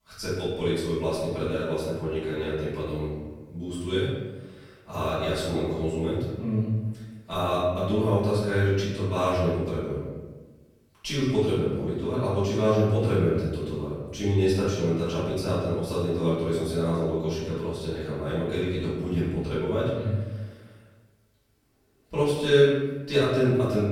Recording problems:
room echo; strong; dies away in 1 s
off-mic speech; far

